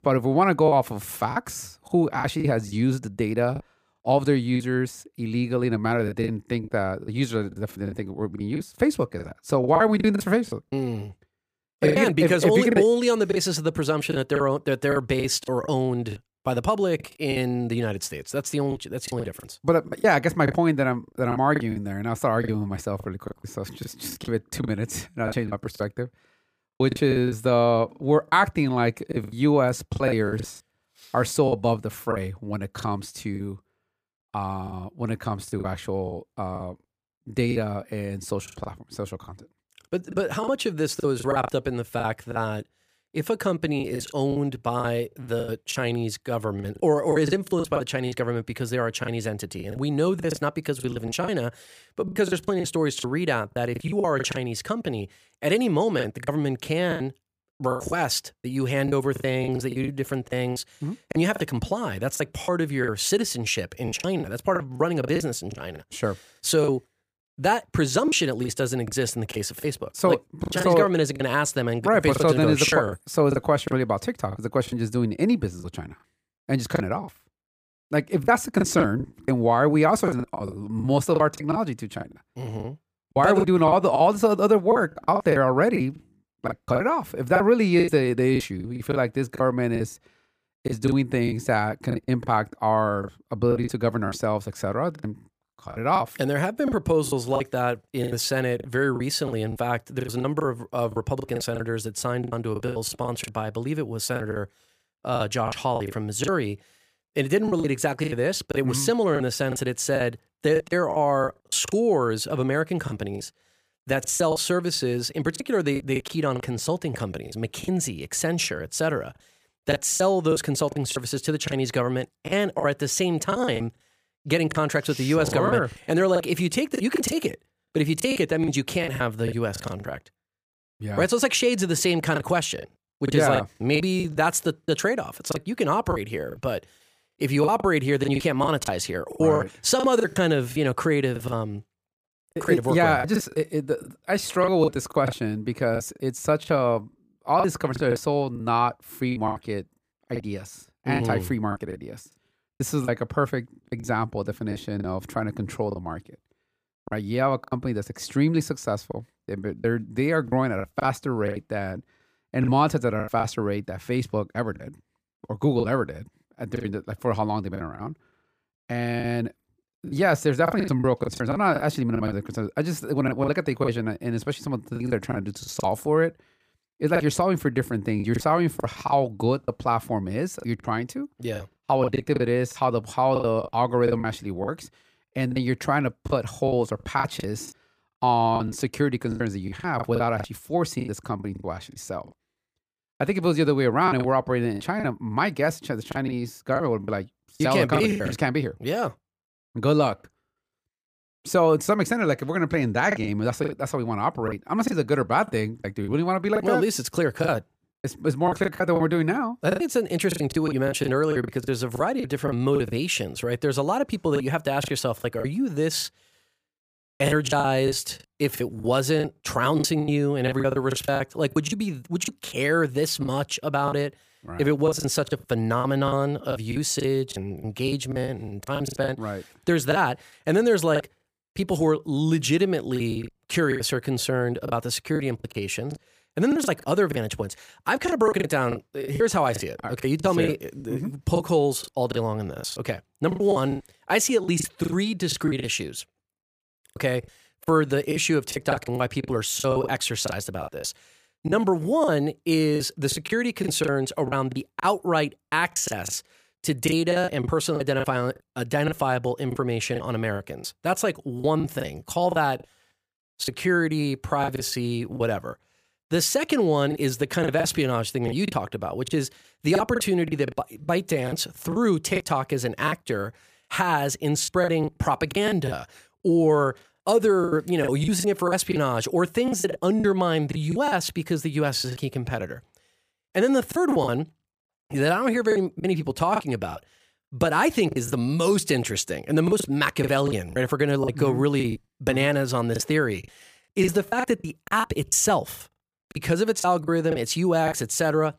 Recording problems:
choppy; very; 11% of the speech affected

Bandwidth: 15 kHz